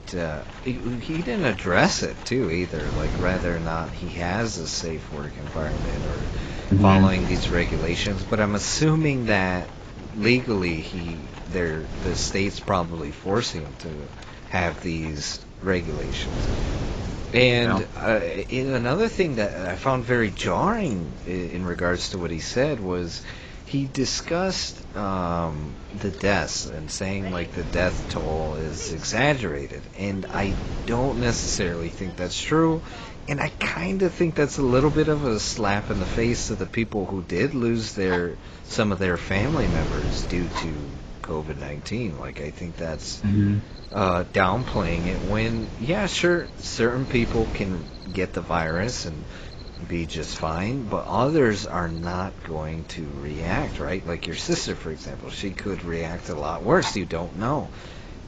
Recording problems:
garbled, watery; badly; nothing above 7.5 kHz
wind noise on the microphone; occasional gusts; 15 dB below the speech
animal sounds; faint; throughout; 20 dB below the speech

